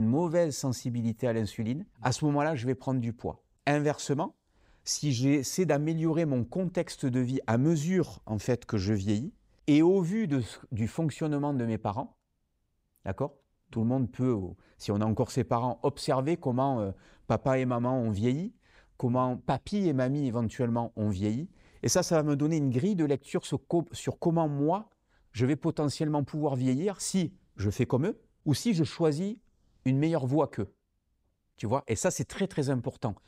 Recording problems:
abrupt cut into speech; at the start

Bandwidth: 15.5 kHz